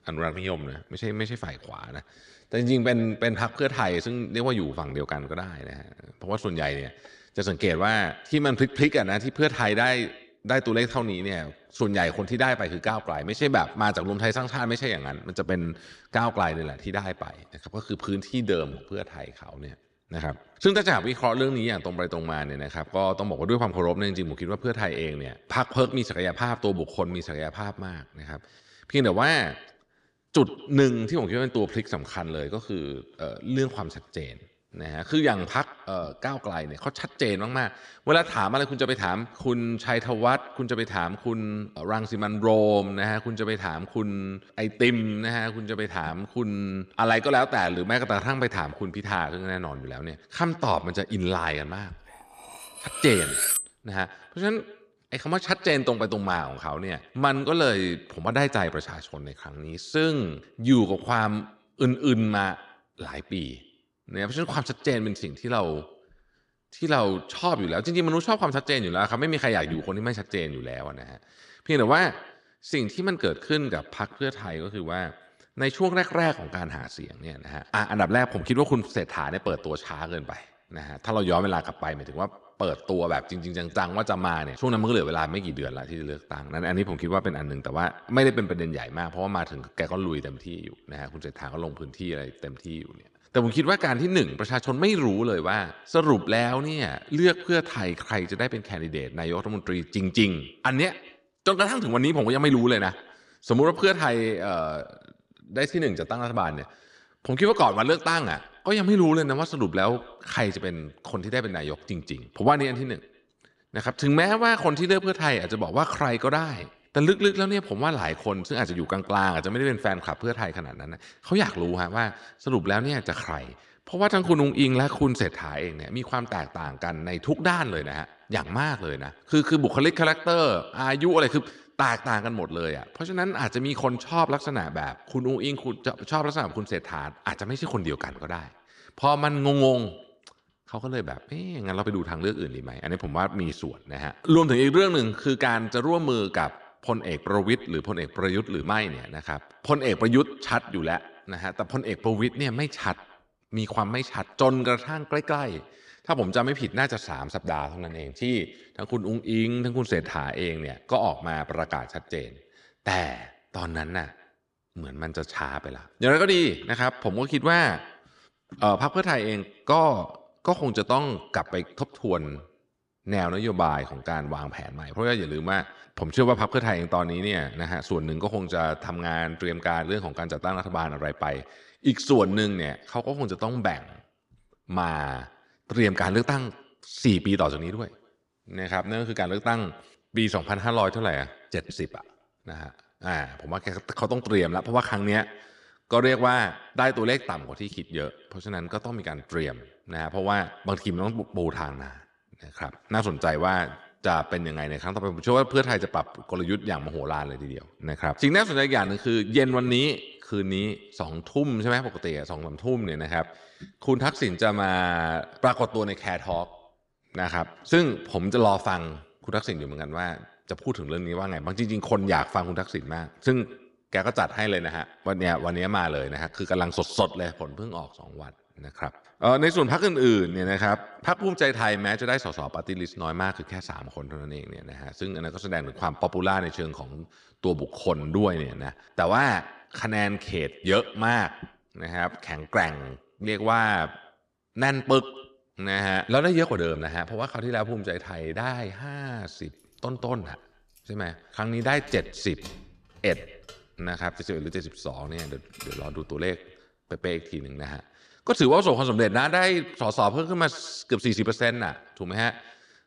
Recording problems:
echo of what is said; faint; throughout; 110 ms later, 20 dB below the speech
clattering dishes; loud; at 53 s; peak 4 dB above the speech
jangling keys; faint; from 4:11 to 4:16; peak 15 dB below the speech

